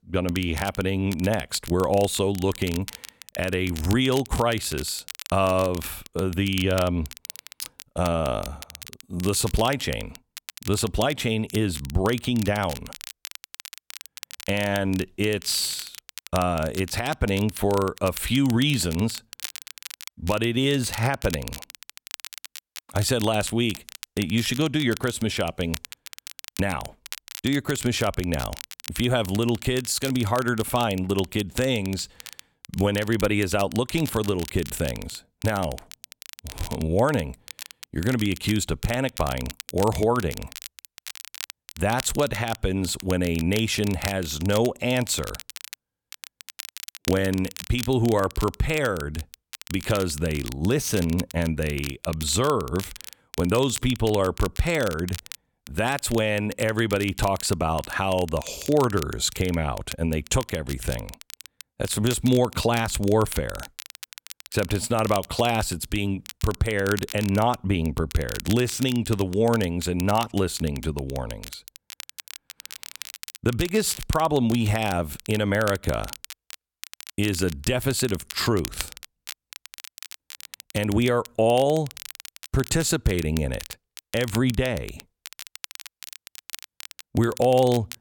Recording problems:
crackle, like an old record; noticeable; 15 dB below the speech

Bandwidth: 18 kHz